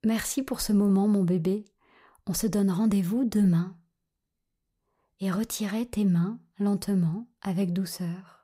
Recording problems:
none

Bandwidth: 15.5 kHz